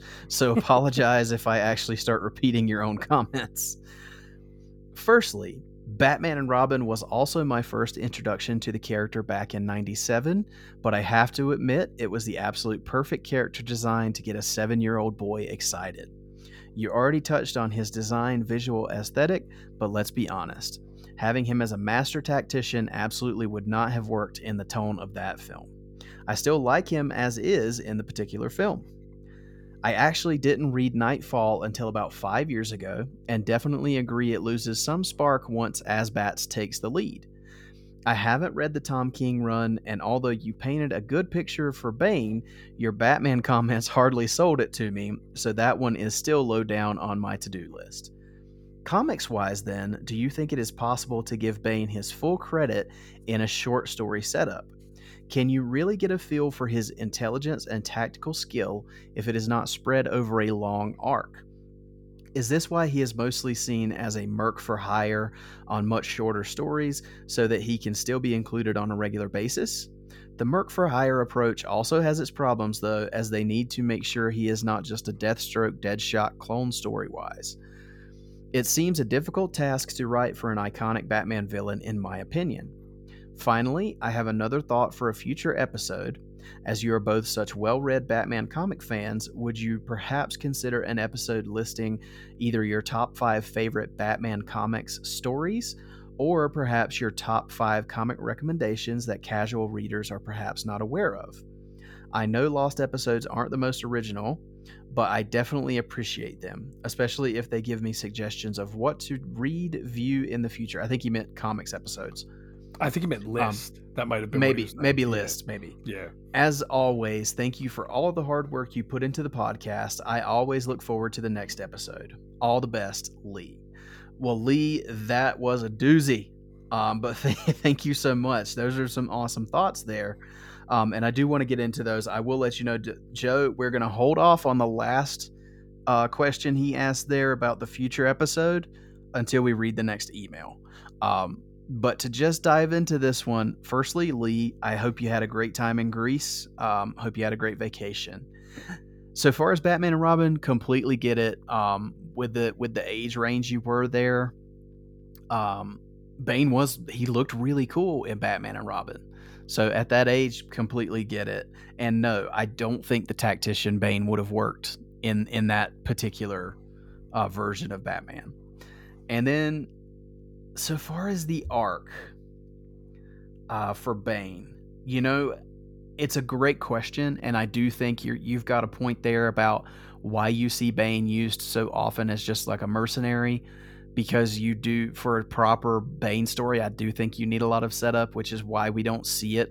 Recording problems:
electrical hum; faint; throughout; 50 Hz, 30 dB below the speech

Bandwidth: 17 kHz